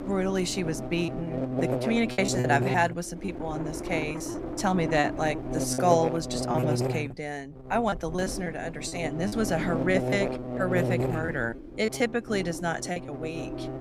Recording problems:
electrical hum; loud; throughout; 50 Hz, 6 dB below the speech
wind noise on the microphone; occasional gusts; 15 dB below the speech
choppy; very; 6% of the speech affected

